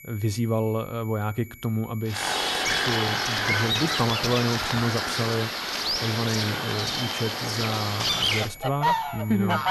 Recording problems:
distortion; slight; 10 dB below the speech
animal sounds; very loud; from 2 s on; 3 dB above the speech
high-pitched whine; noticeable; throughout; 2.5 kHz, 15 dB below the speech

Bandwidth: 14.5 kHz